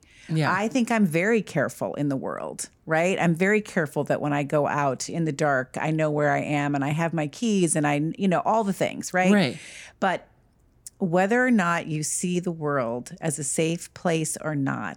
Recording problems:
none

